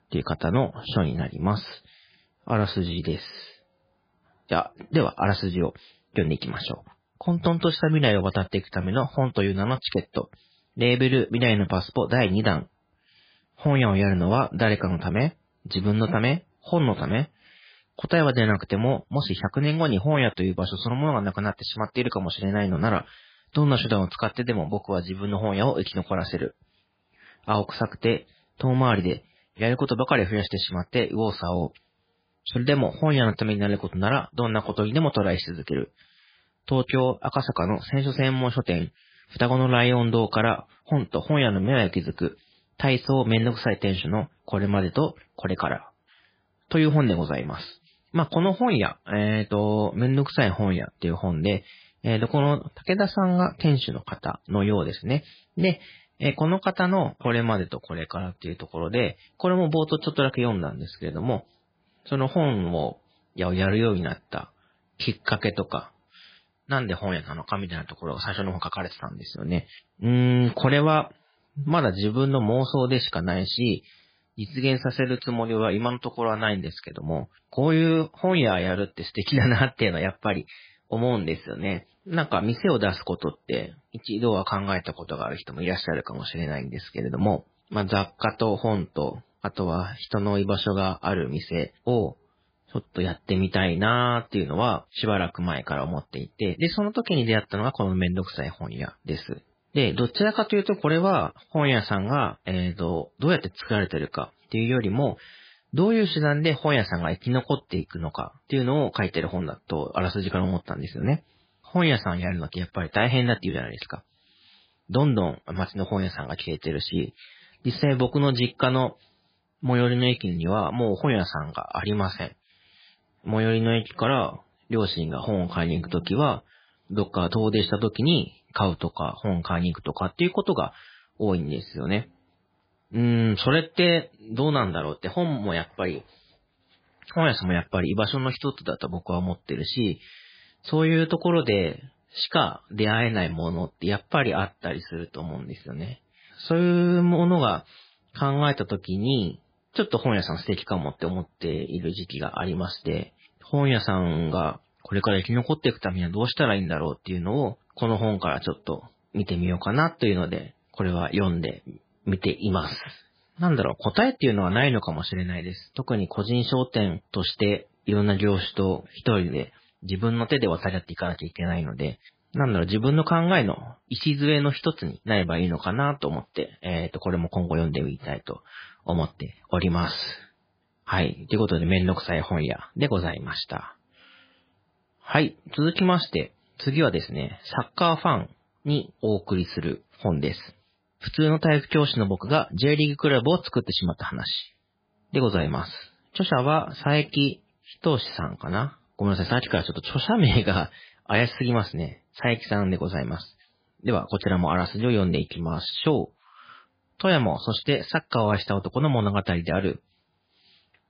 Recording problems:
garbled, watery; badly; nothing above 4 kHz

